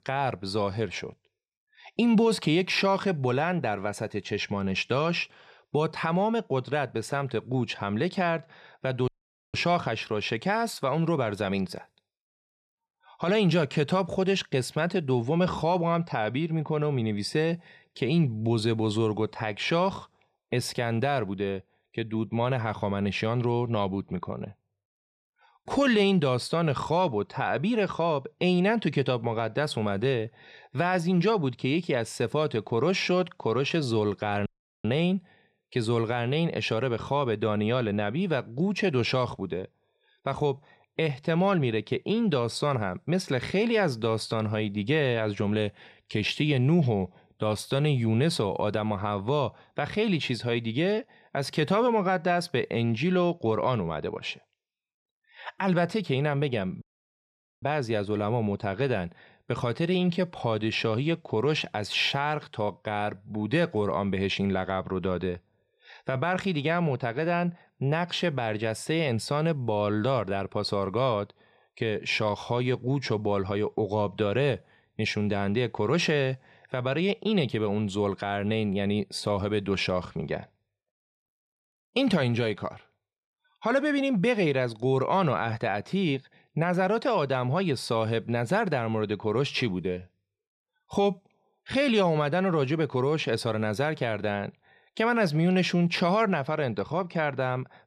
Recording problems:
audio cutting out; at 9 s, at 34 s and at 57 s for 1 s

